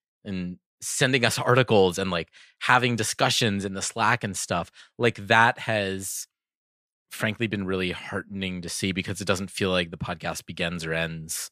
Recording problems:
none

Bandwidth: 14.5 kHz